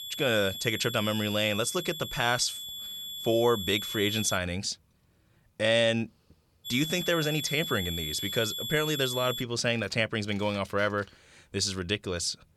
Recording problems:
high-pitched whine; loud; until 4.5 s and from 6.5 to 9.5 s; 3.5 kHz, 6 dB below the speech

